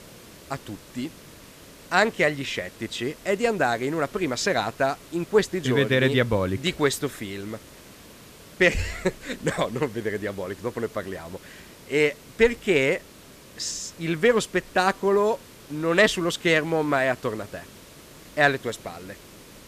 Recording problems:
hiss; faint; throughout; 20 dB below the speech

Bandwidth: 14.5 kHz